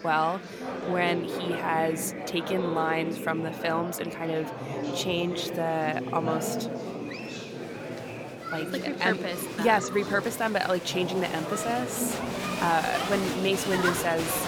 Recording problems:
chatter from many people; loud; throughout; 4 dB below the speech

